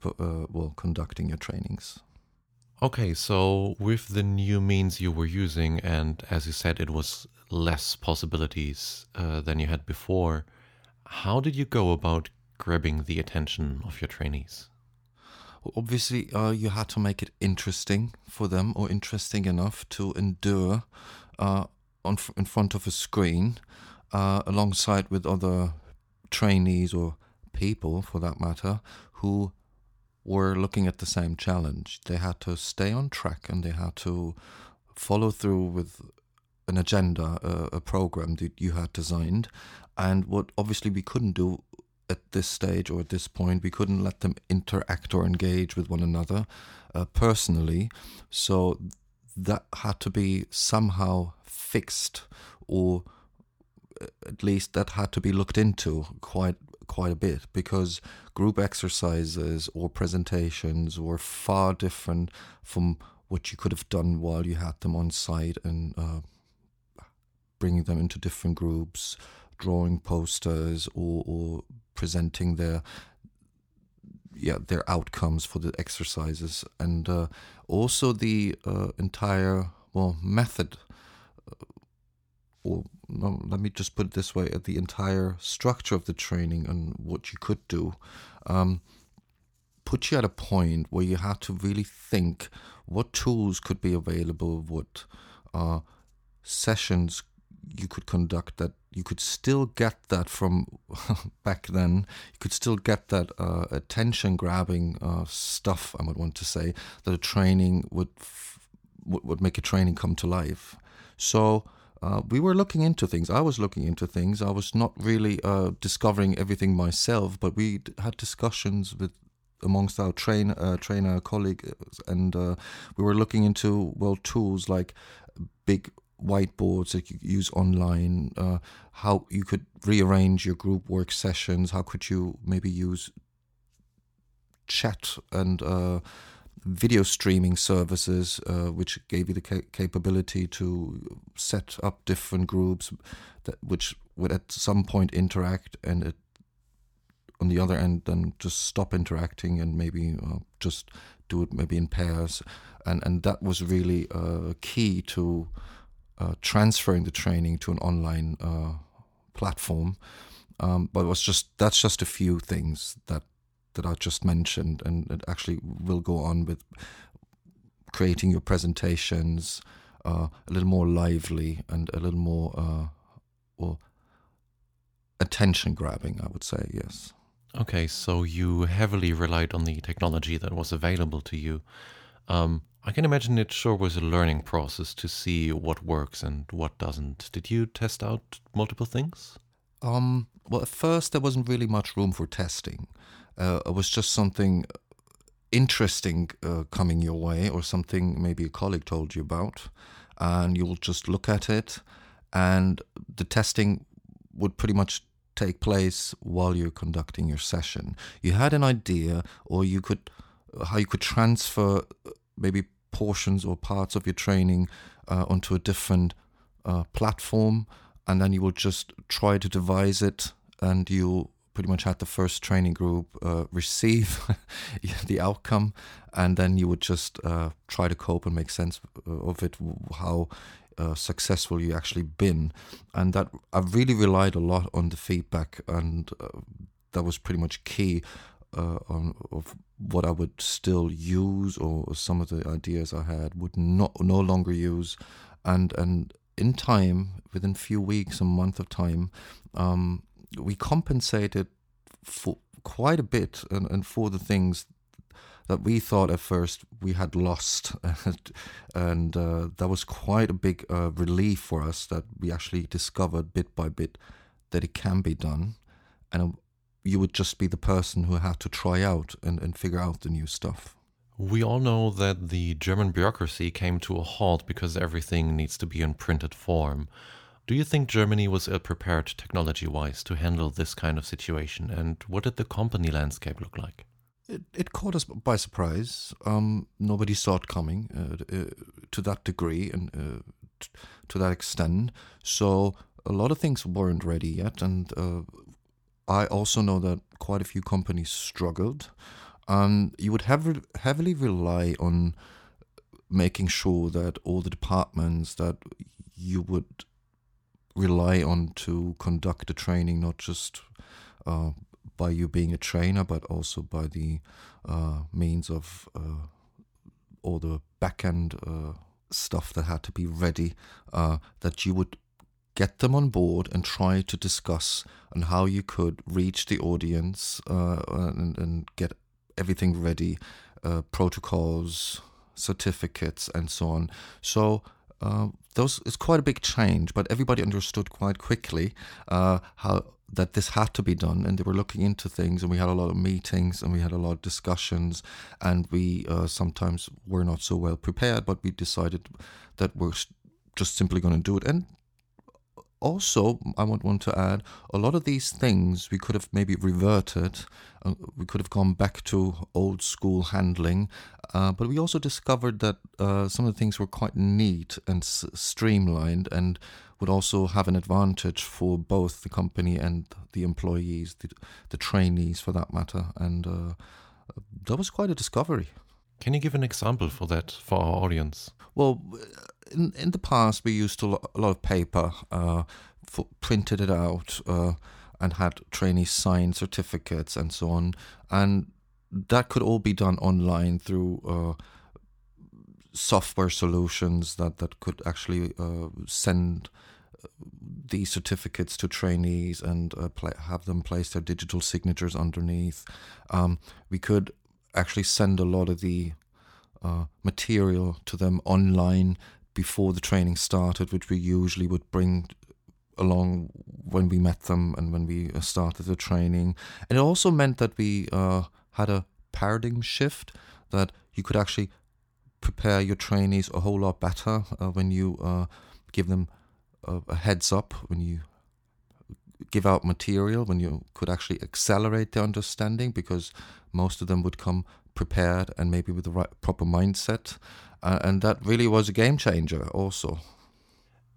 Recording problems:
none

